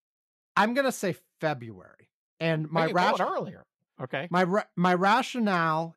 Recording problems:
none

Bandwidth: 14 kHz